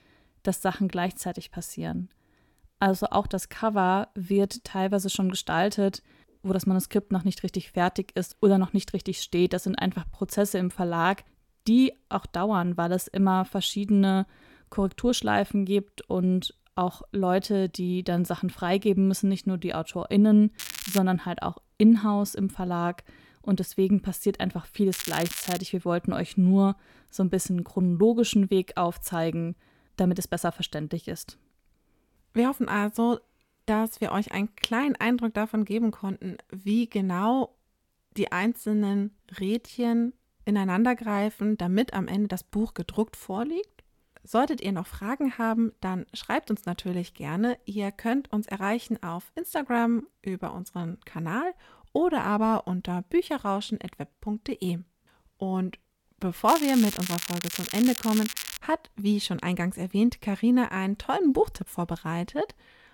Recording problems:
crackling; loud; at 21 s, at 25 s and from 56 to 59 s; 7 dB below the speech

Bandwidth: 17 kHz